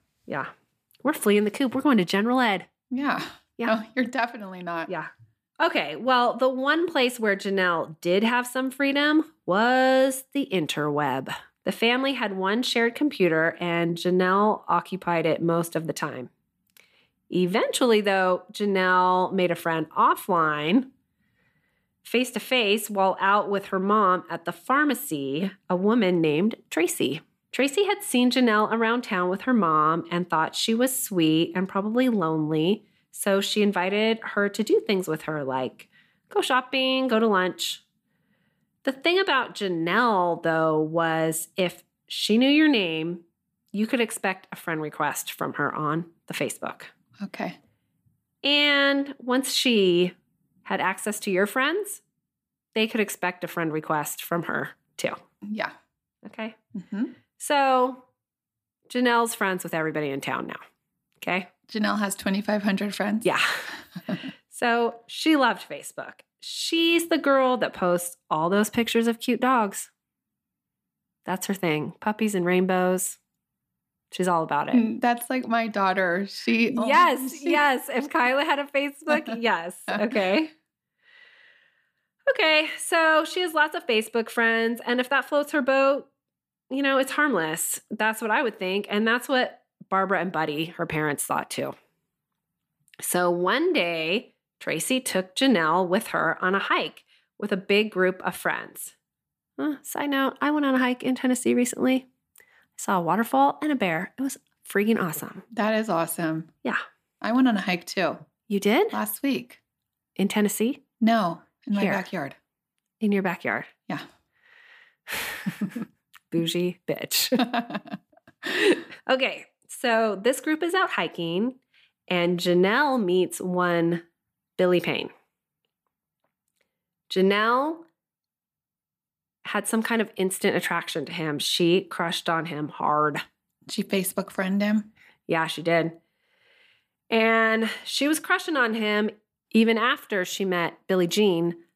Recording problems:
none

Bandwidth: 15 kHz